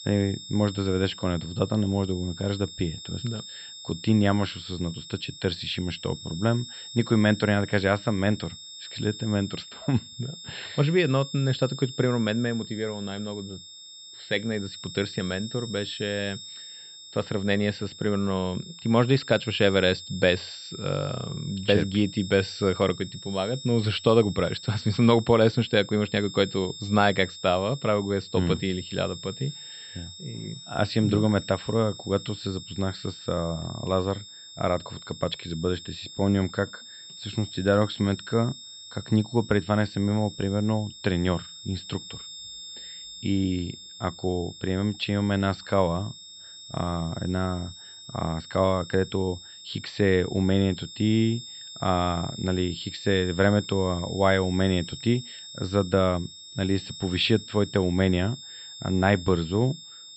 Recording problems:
muffled; very slightly; fading above 4 kHz
high-pitched whine; noticeable; throughout; 3.5 kHz, 15 dB below the speech

